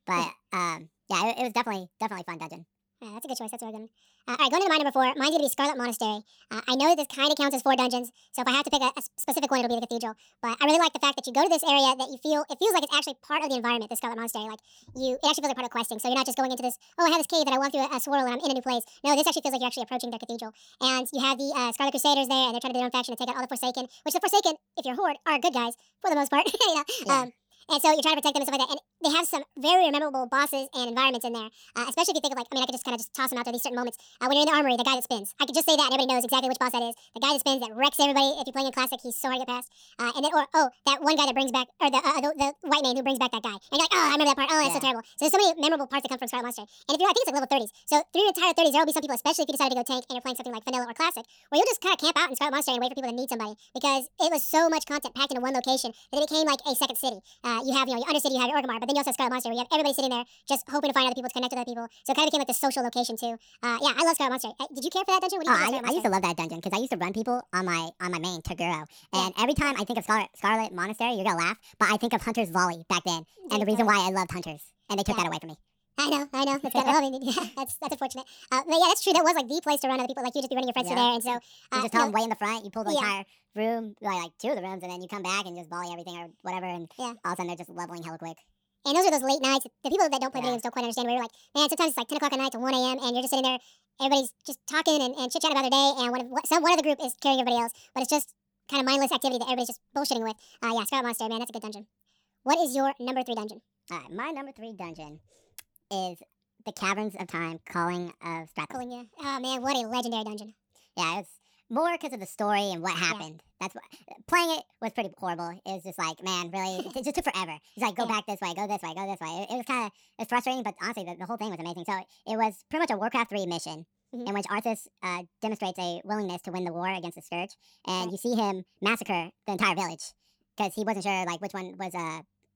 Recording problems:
wrong speed and pitch; too fast and too high; 1.6 times normal speed

